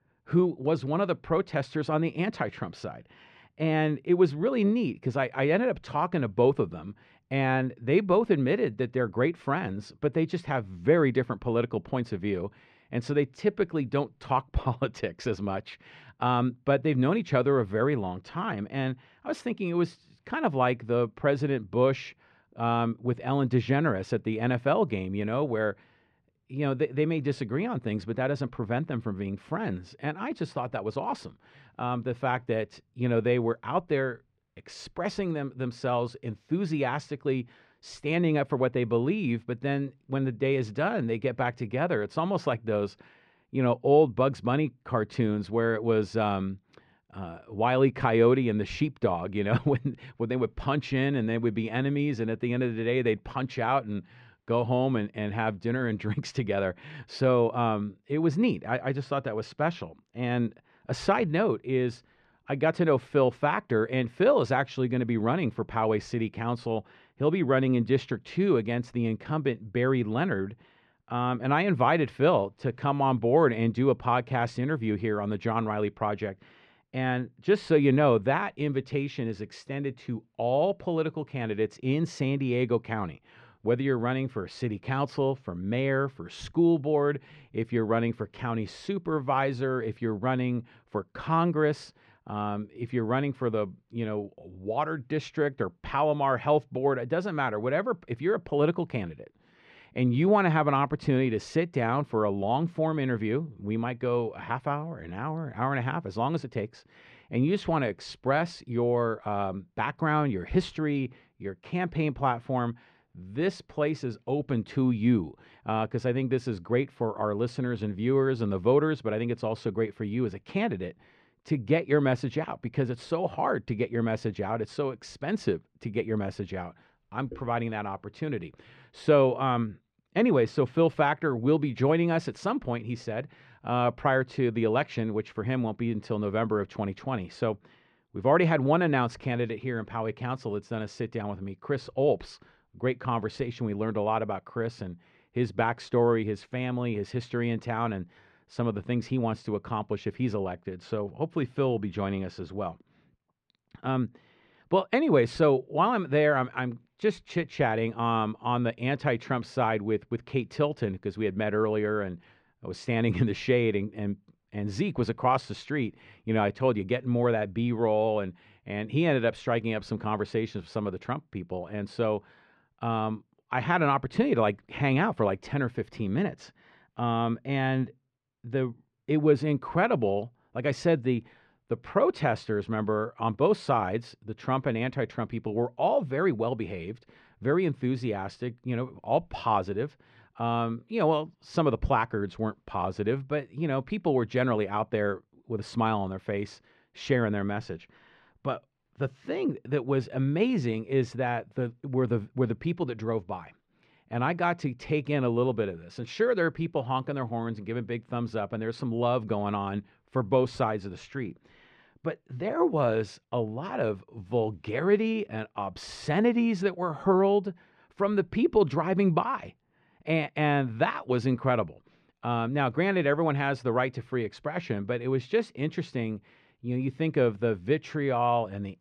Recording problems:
muffled; very; fading above 2.5 kHz

